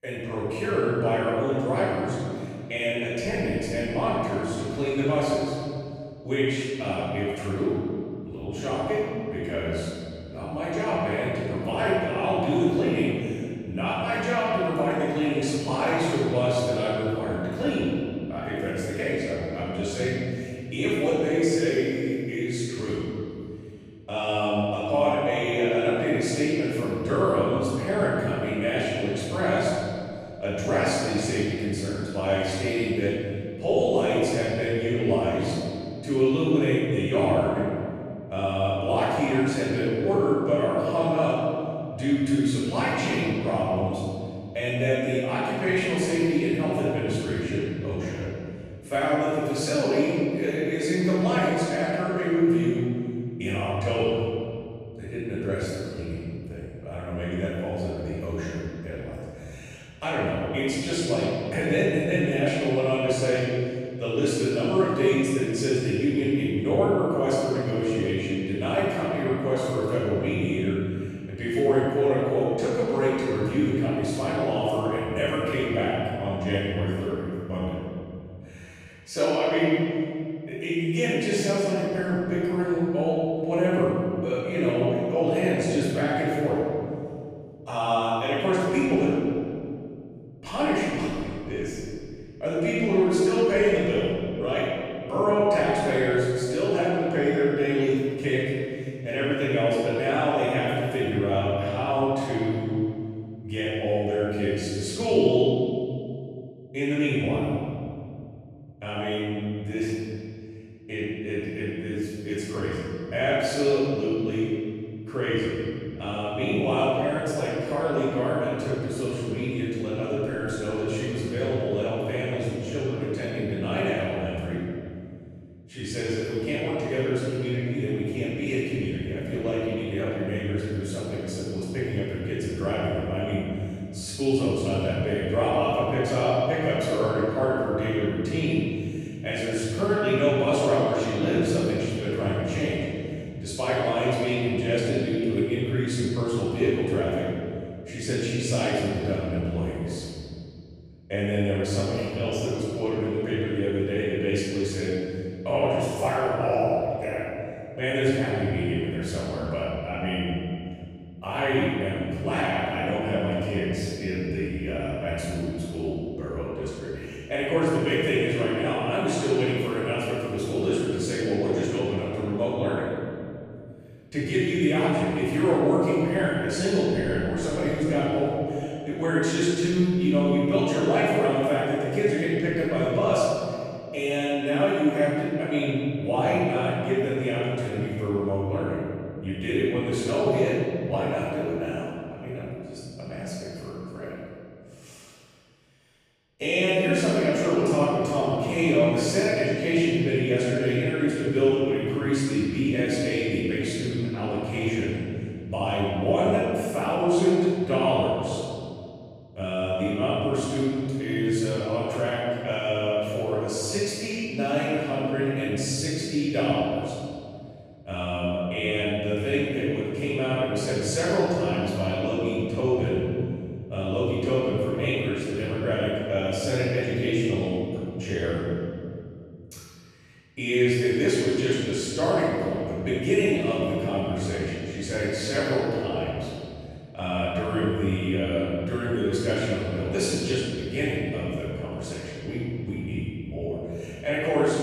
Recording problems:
room echo; strong; dies away in 2.5 s
off-mic speech; far

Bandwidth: 14.5 kHz